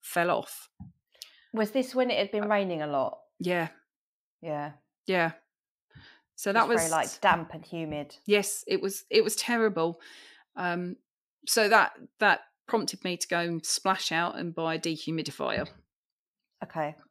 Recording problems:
none

